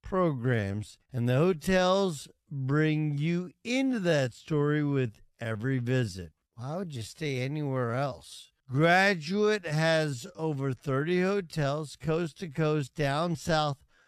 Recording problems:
wrong speed, natural pitch; too slow; 0.6 times normal speed

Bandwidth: 14 kHz